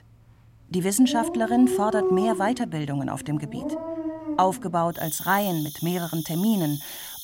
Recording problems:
animal sounds; loud; throughout; 6 dB below the speech

